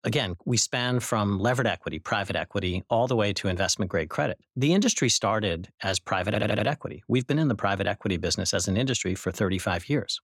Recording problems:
audio stuttering; at 6.5 s

